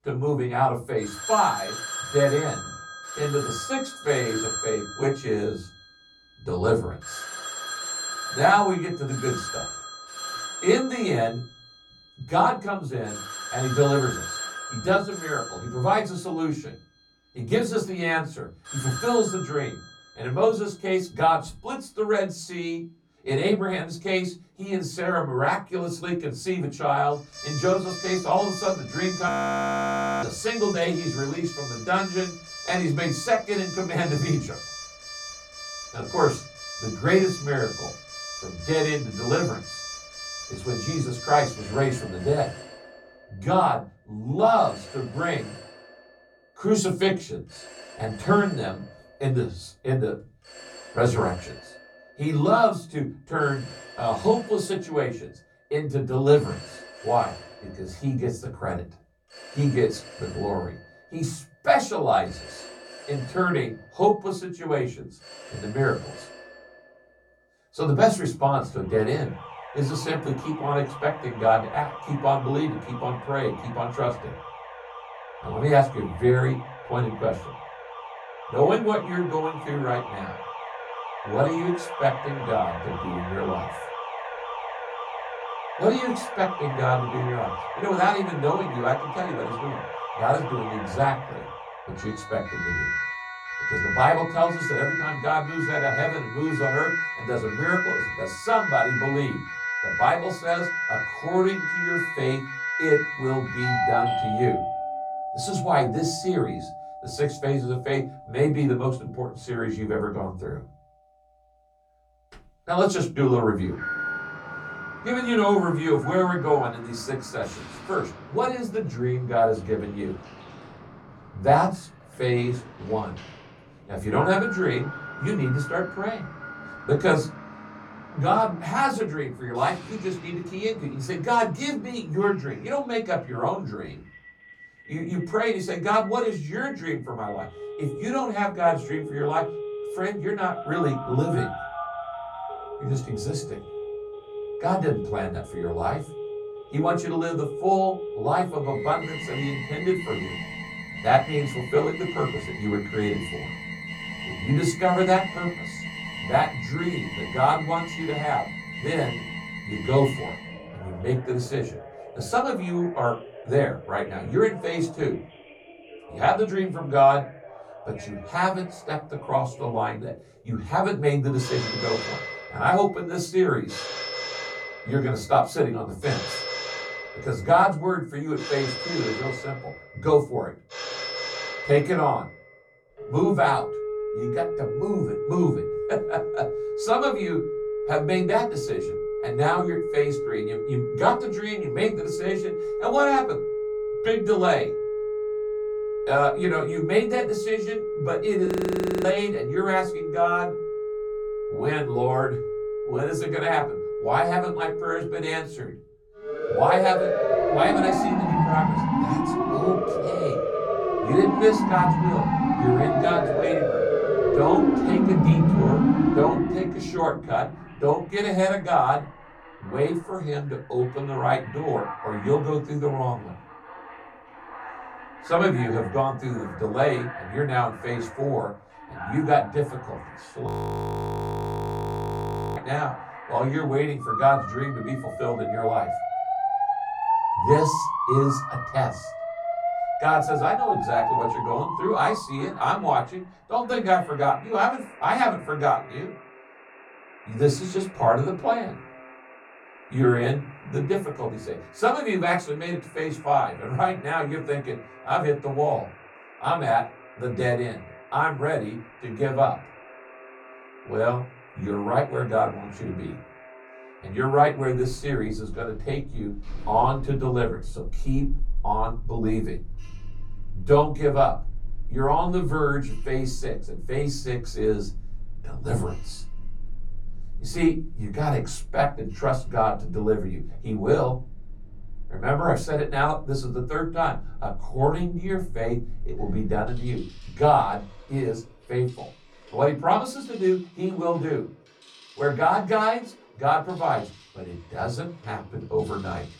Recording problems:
off-mic speech; far
room echo; very slight; dies away in 0.3 s
alarms or sirens; loud; throughout; 5 dB below the speech
audio freezing; at 29 s for 1 s, at 3:18 for 0.5 s and at 3:50 for 2 s

